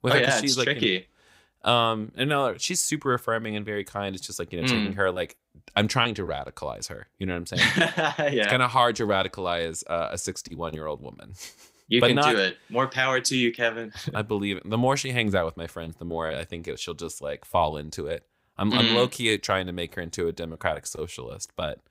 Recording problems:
none

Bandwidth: 15.5 kHz